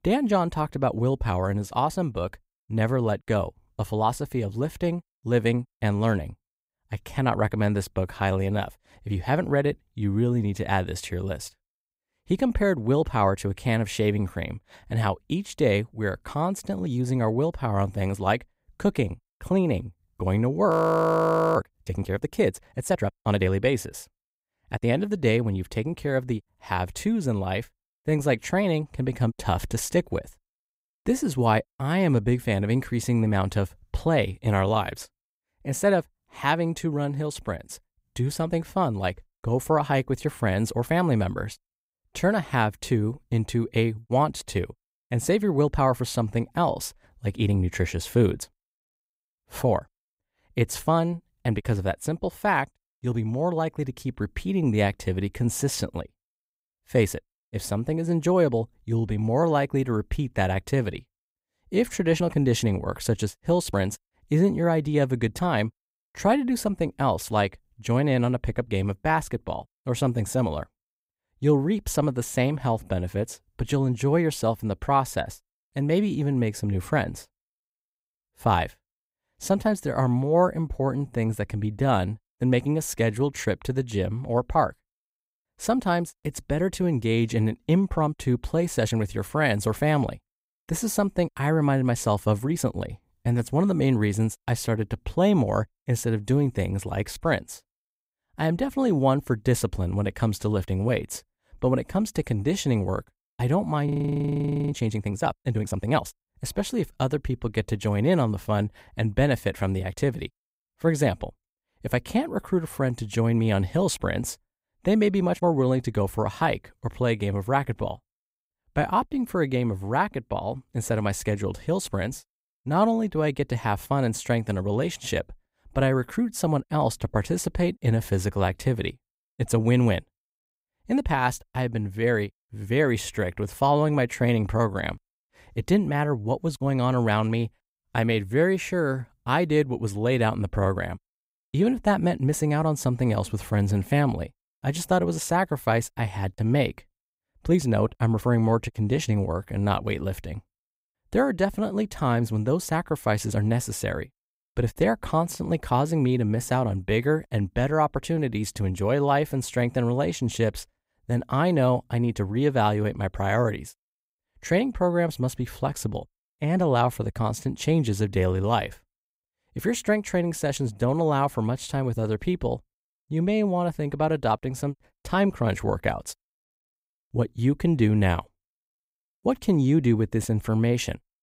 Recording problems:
audio freezing; at 21 s for 1 s and at 1:44 for 1 s

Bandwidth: 15.5 kHz